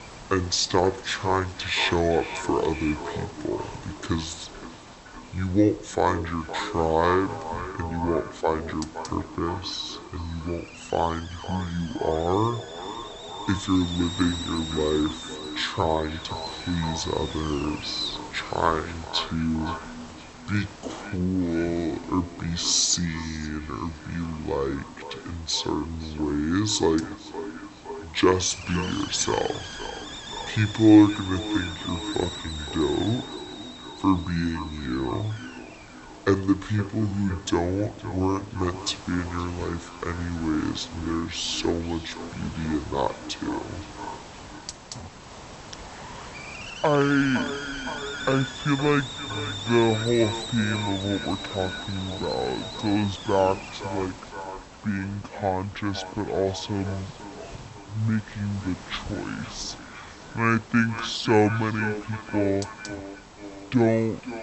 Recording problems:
wrong speed and pitch; too slow and too low; 0.6 times normal speed
echo of what is said; noticeable; throughout; 510 ms later, 15 dB below the speech
hiss; noticeable; throughout; 15 dB below the speech

